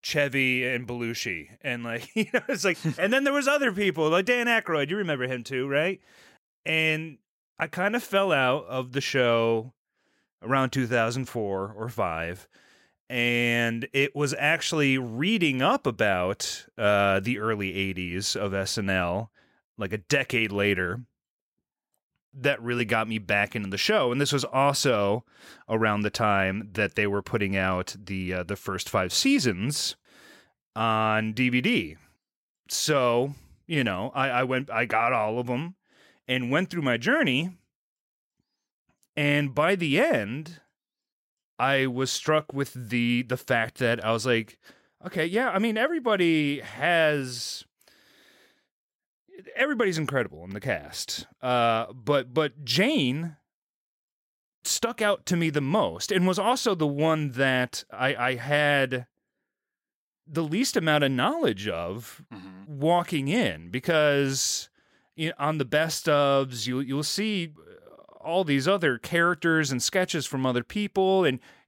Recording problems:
none

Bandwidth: 16 kHz